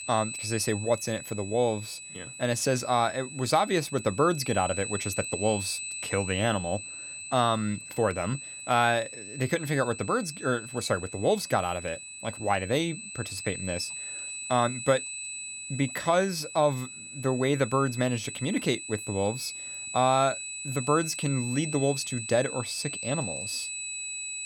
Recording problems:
high-pitched whine; loud; throughout; 8 kHz, 8 dB below the speech

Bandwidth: 17.5 kHz